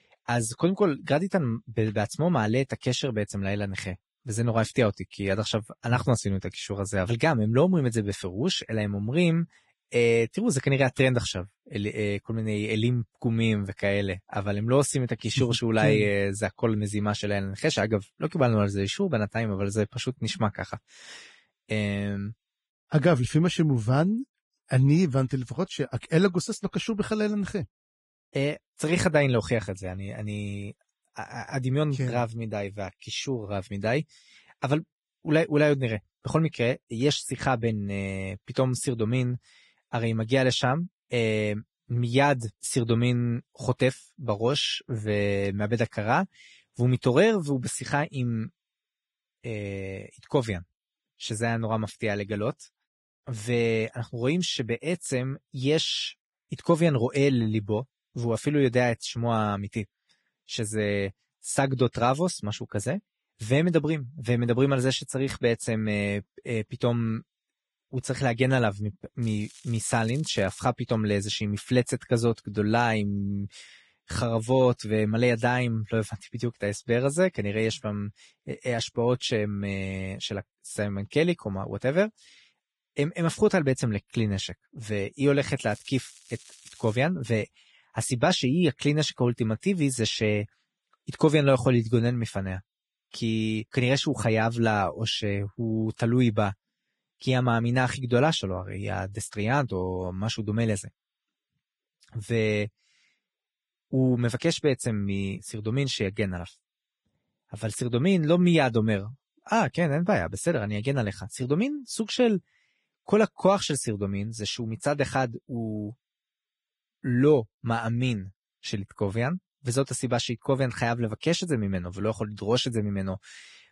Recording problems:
garbled, watery; badly; nothing above 10.5 kHz
crackling; faint; from 1:09 to 1:11 and from 1:26 to 1:27; 20 dB below the speech

